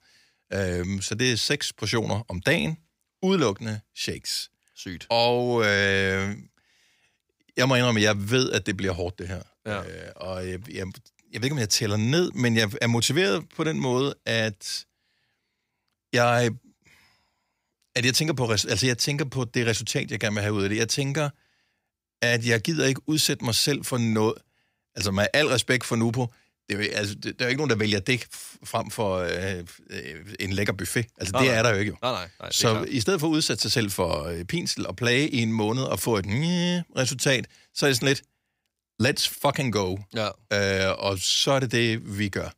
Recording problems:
none

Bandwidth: 15.5 kHz